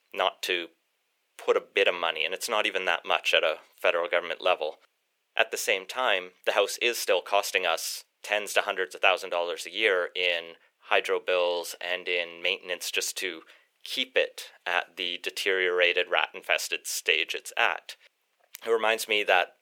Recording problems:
thin; very; fading below 450 Hz

